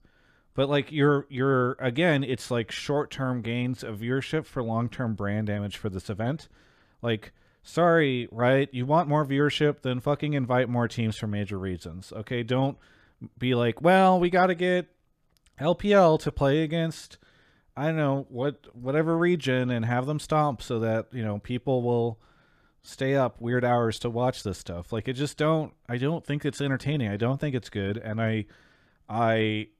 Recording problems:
none

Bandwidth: 14.5 kHz